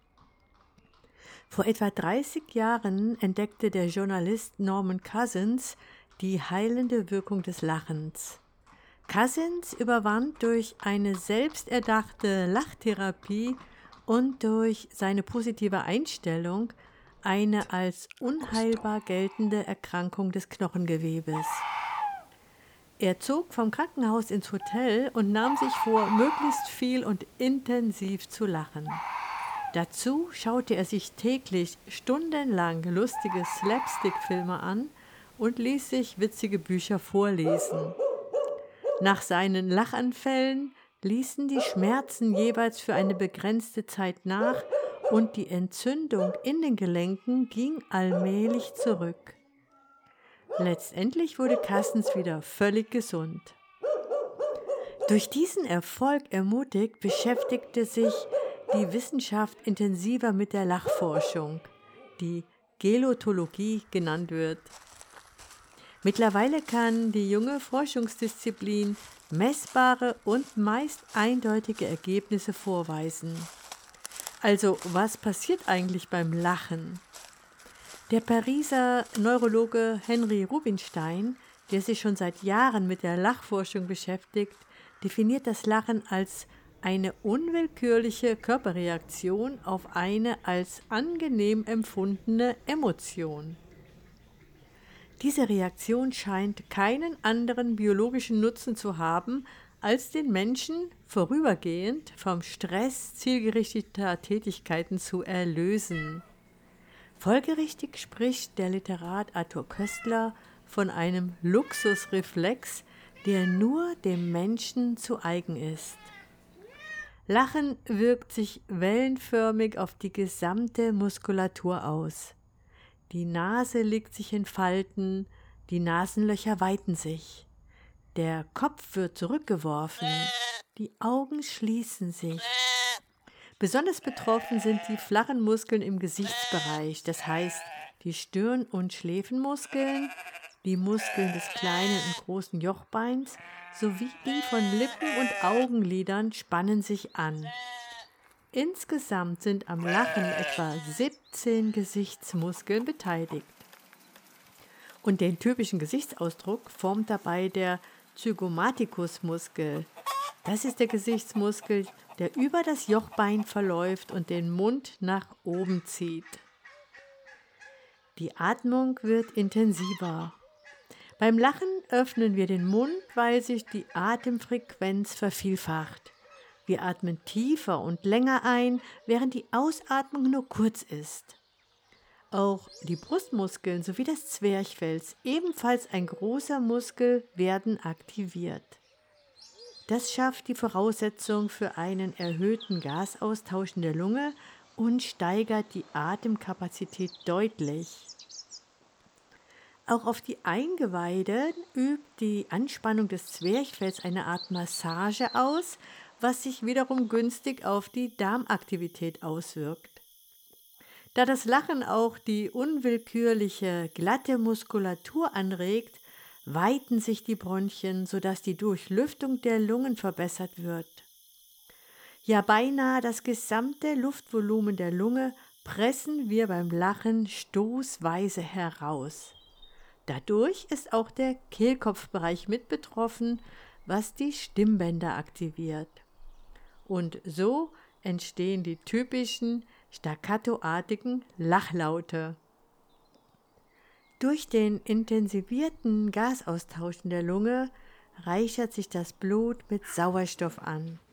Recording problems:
animal sounds; loud; throughout; 7 dB below the speech

